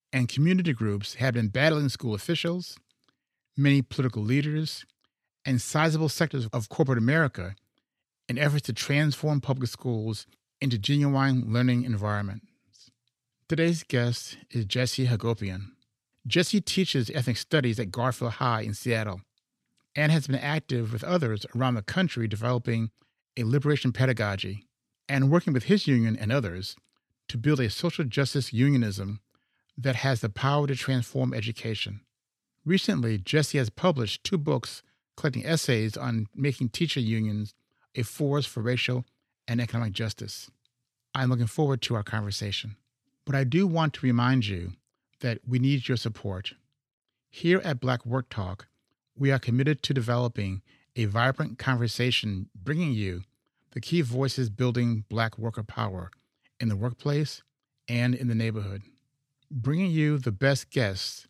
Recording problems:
none

